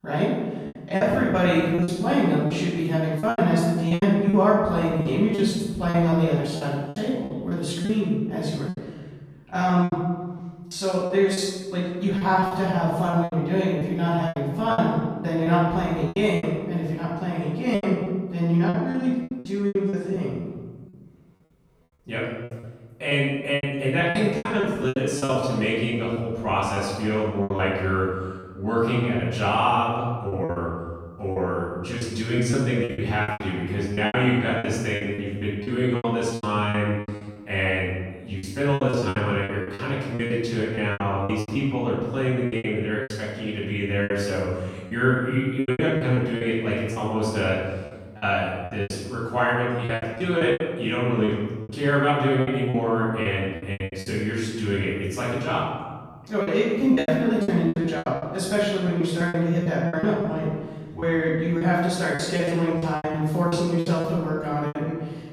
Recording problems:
room echo; strong; dies away in 1.3 s
off-mic speech; far
choppy; very; 13% of the speech affected

